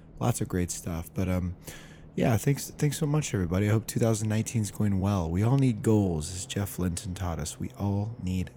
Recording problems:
train or aircraft noise; faint; throughout; 20 dB below the speech

